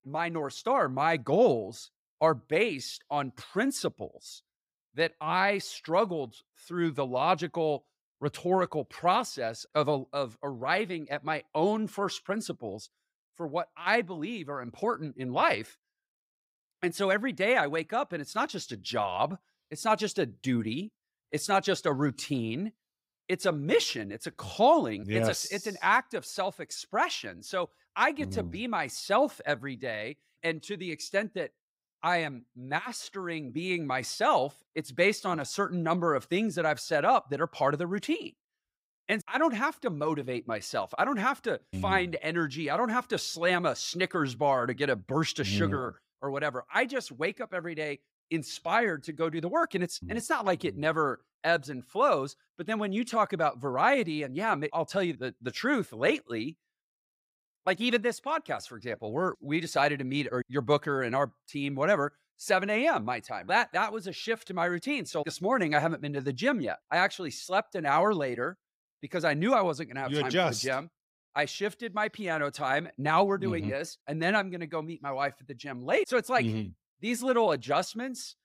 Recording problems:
none

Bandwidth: 15.5 kHz